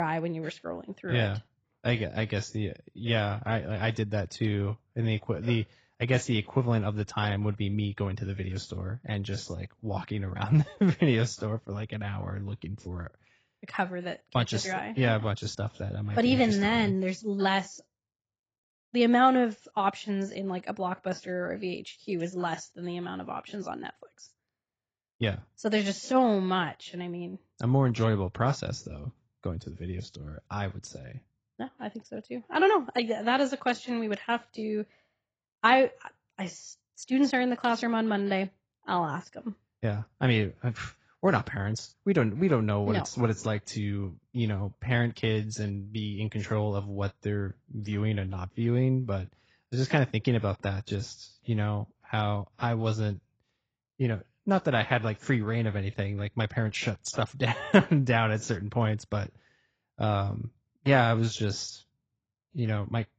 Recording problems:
garbled, watery; badly; nothing above 7.5 kHz
abrupt cut into speech; at the start

